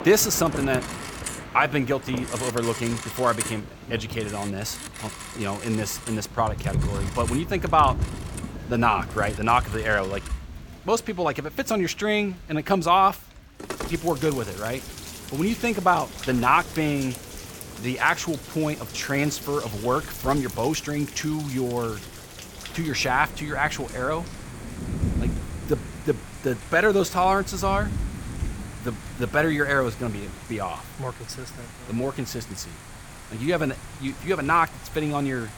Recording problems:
alarms or sirens; noticeable; throughout; 10 dB below the speech
rain or running water; noticeable; throughout; 10 dB below the speech

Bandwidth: 18 kHz